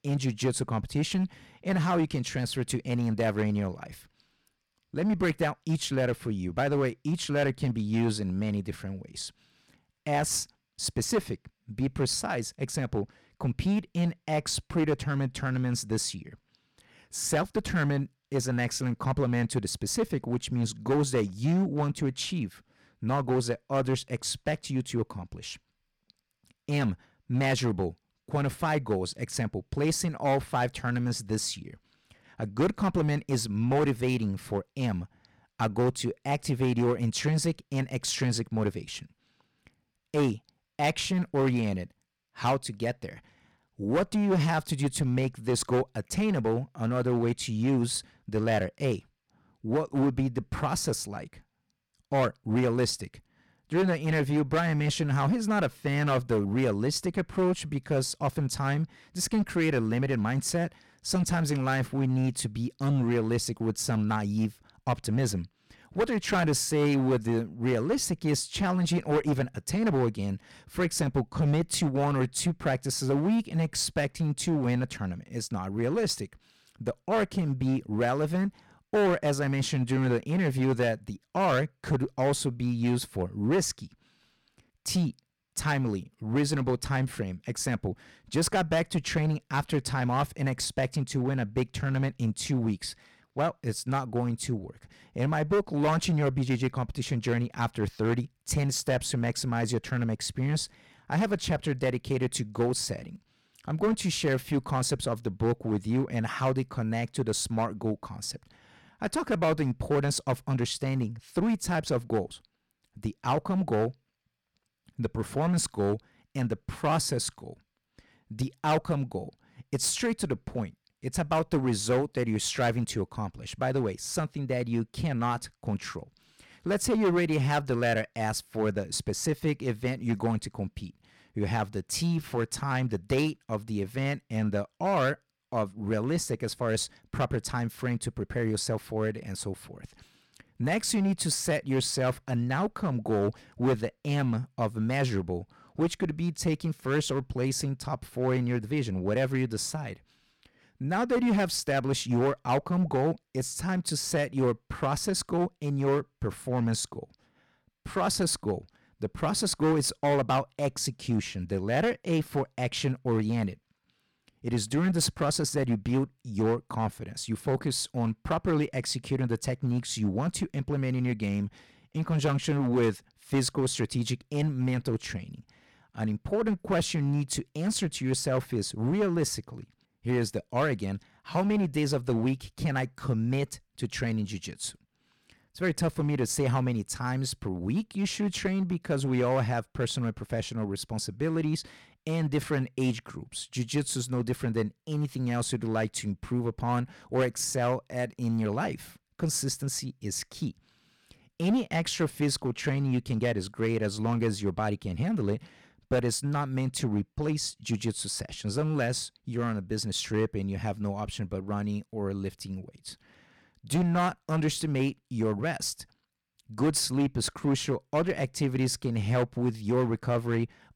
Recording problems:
distortion; slight; 6% of the sound clipped

